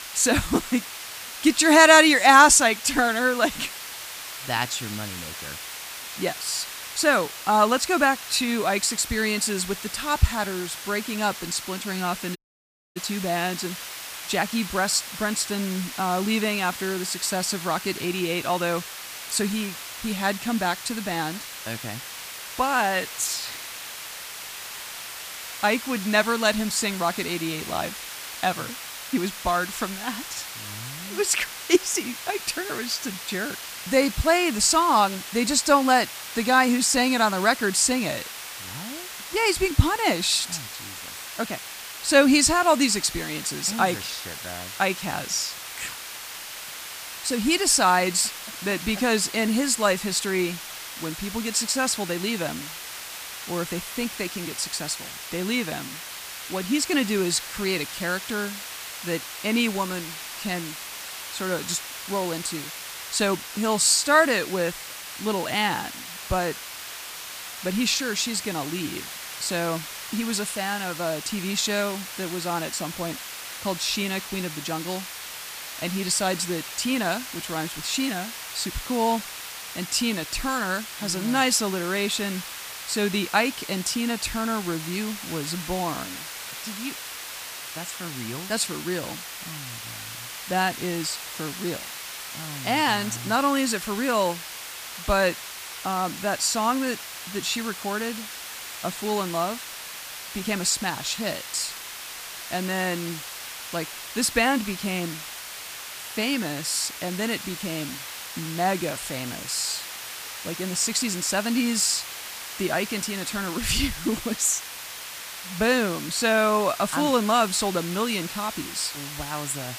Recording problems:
hiss; loud; throughout; 10 dB below the speech
audio cutting out; at 12 s for 0.5 s

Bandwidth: 15 kHz